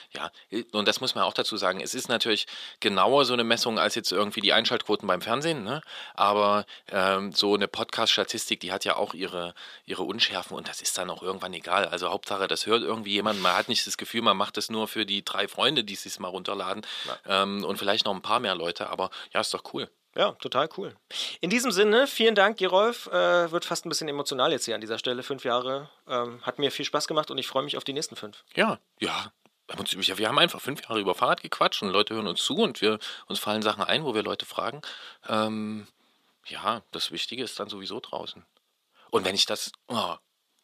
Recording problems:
thin; somewhat; fading below 350 Hz

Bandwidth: 14.5 kHz